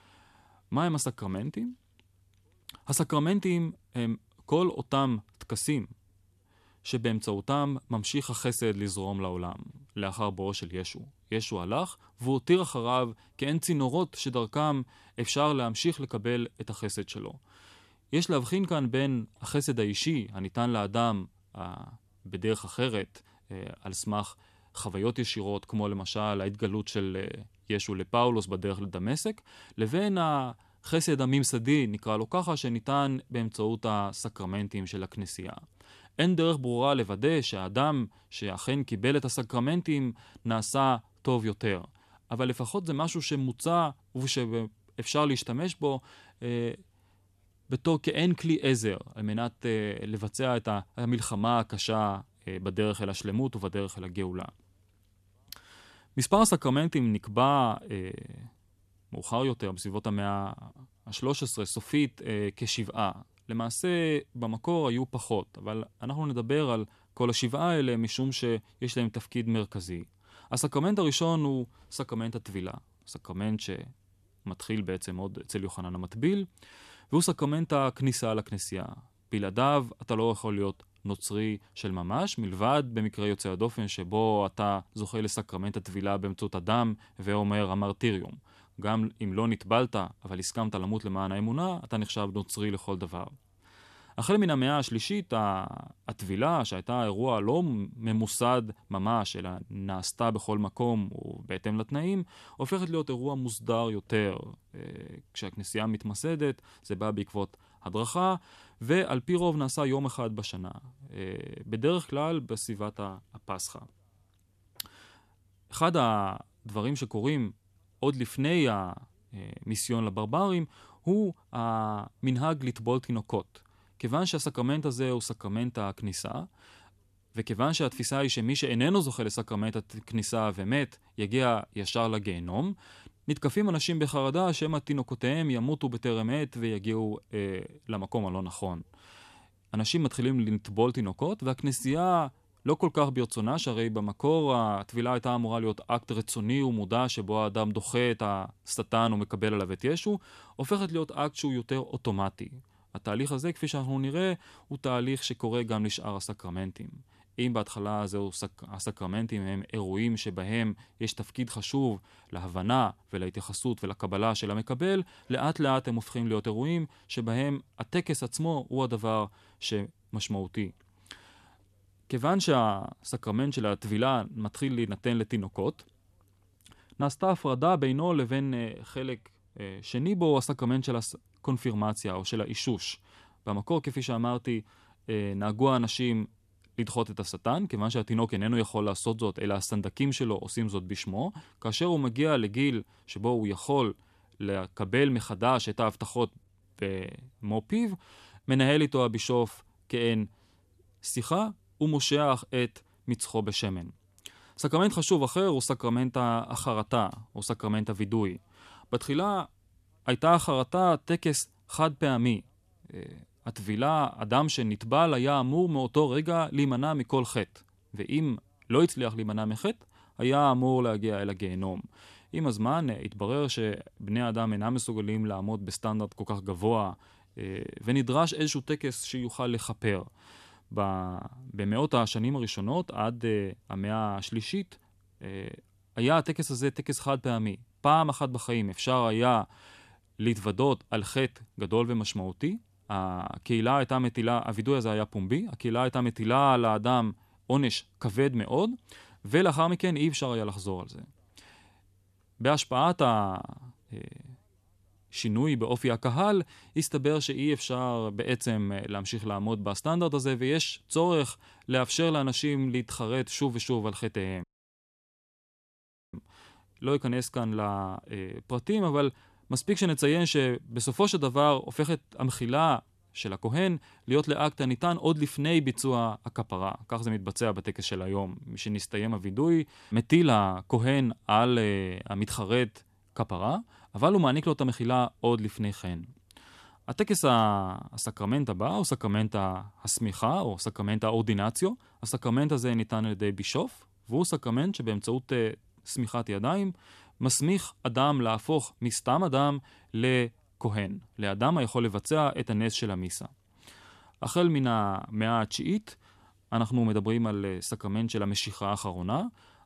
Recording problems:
audio cutting out; at 4:24 for 1.5 s

